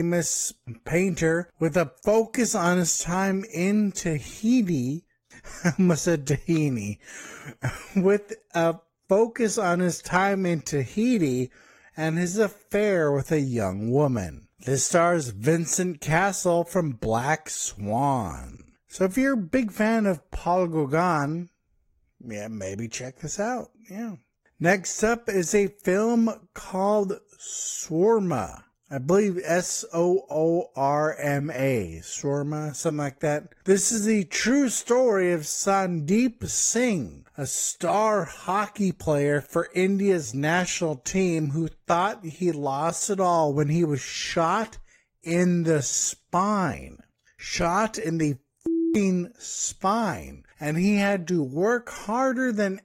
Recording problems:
wrong speed, natural pitch; too slow; 0.7 times normal speed
garbled, watery; slightly; nothing above 15.5 kHz
abrupt cut into speech; at the start

